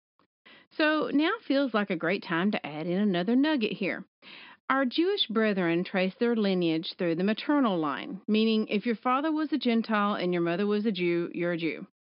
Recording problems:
high frequencies cut off; noticeable; nothing above 5.5 kHz

